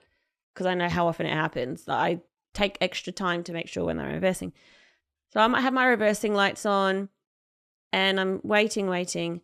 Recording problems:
none

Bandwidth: 14 kHz